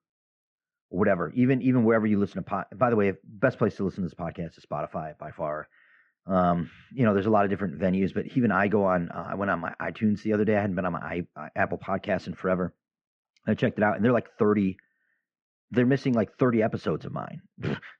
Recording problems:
muffled; very; fading above 2 kHz

